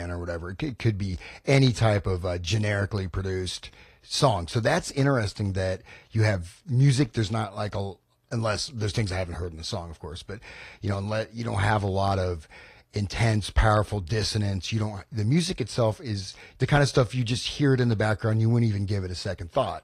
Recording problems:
garbled, watery; slightly; nothing above 14.5 kHz
abrupt cut into speech; at the start

